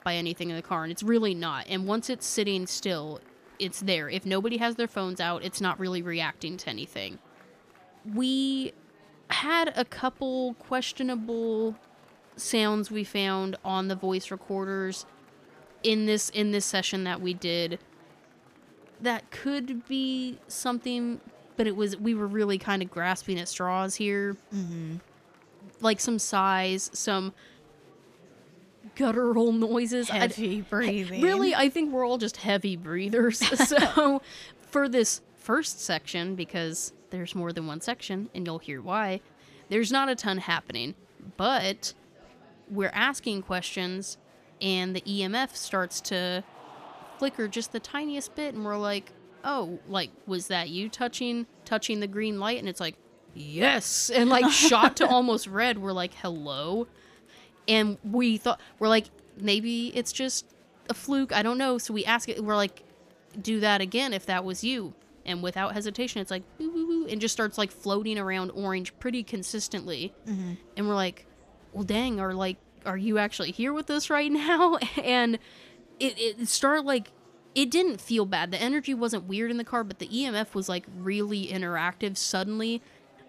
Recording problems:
murmuring crowd; faint; throughout; 30 dB below the speech

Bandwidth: 14.5 kHz